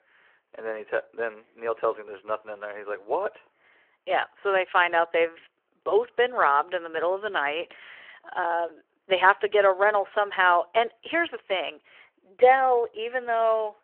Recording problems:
phone-call audio

